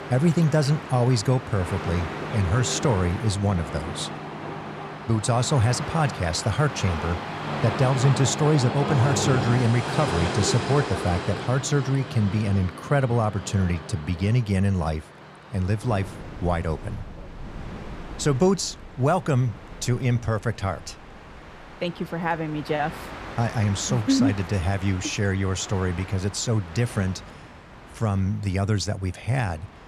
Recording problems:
train or aircraft noise; loud; throughout; 8 dB below the speech

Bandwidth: 14.5 kHz